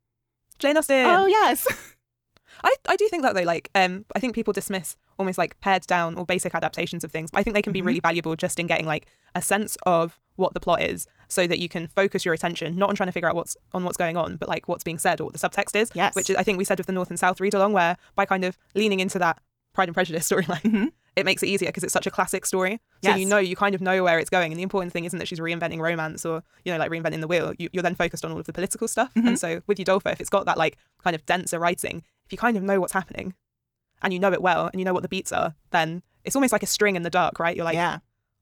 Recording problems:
wrong speed, natural pitch; too fast; 1.6 times normal speed

